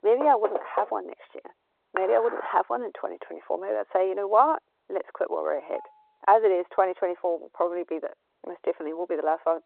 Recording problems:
muffled; very; fading above 2 kHz
phone-call audio
door banging; noticeable; at the start; peak 5 dB below the speech
clattering dishes; noticeable; at 2 s; peak 8 dB below the speech
clattering dishes; faint; at 5.5 s; peak 20 dB below the speech

